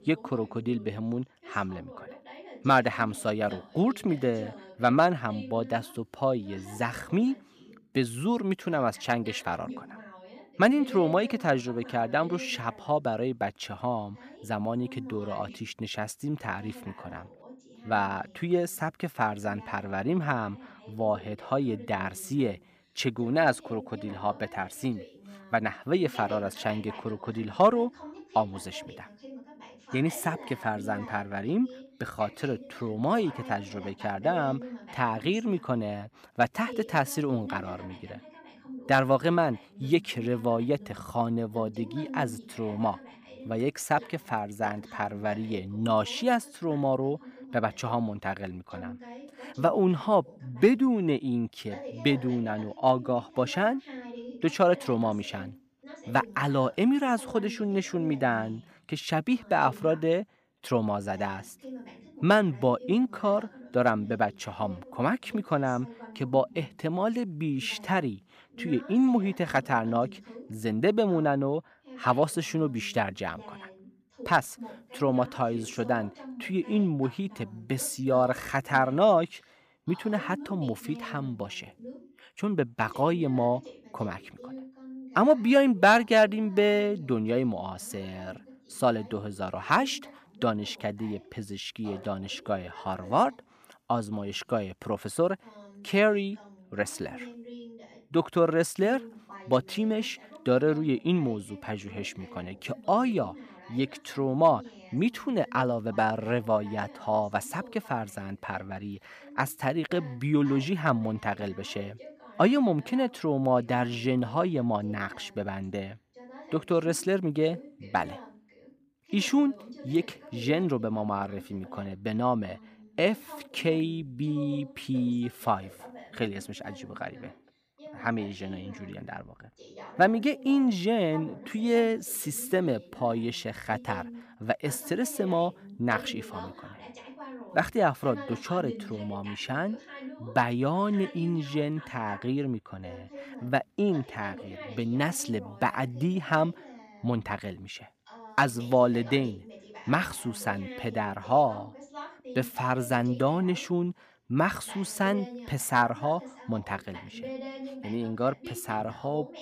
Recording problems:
voice in the background; noticeable; throughout; 20 dB below the speech

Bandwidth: 15 kHz